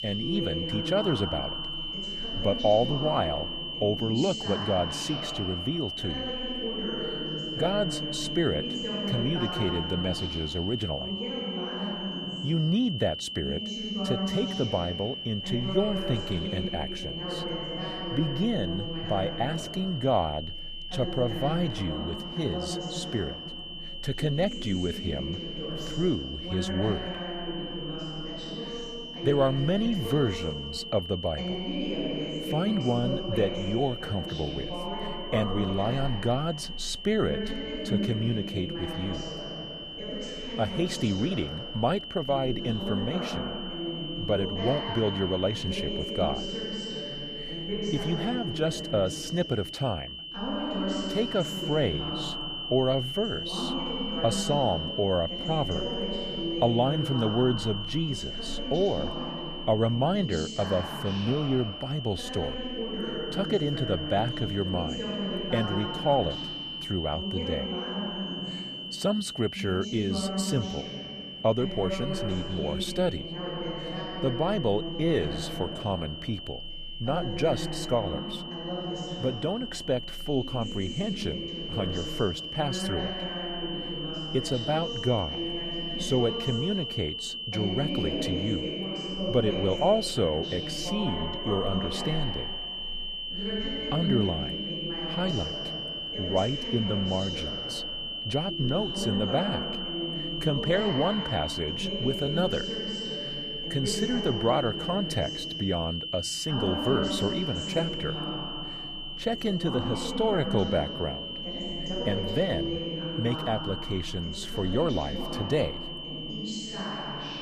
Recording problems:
high-pitched whine; loud; throughout; 3 kHz, 5 dB below the speech
voice in the background; loud; throughout; 6 dB below the speech

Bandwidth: 15 kHz